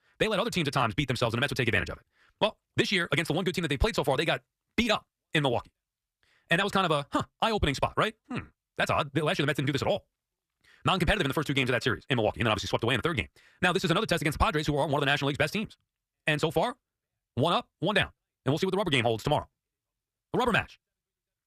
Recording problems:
wrong speed, natural pitch; too fast; 1.8 times normal speed

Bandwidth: 14.5 kHz